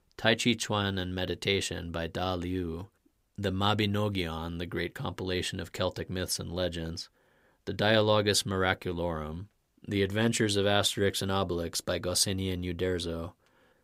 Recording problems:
none

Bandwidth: 15.5 kHz